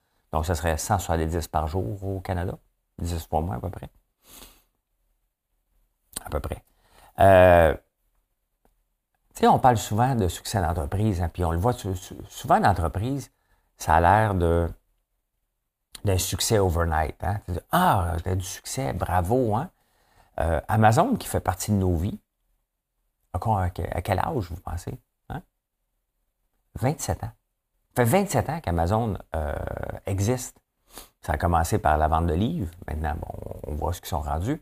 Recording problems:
none

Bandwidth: 15 kHz